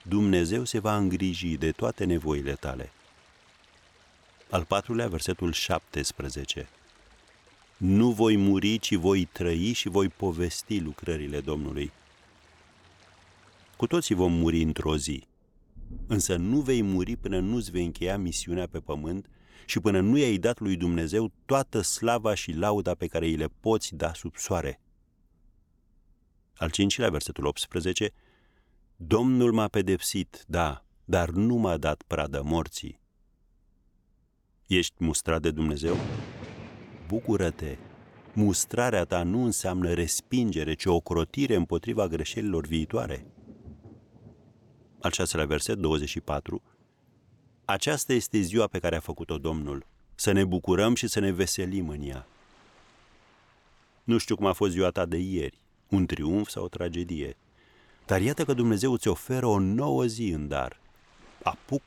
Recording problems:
rain or running water; faint; throughout; 20 dB below the speech

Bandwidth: 18.5 kHz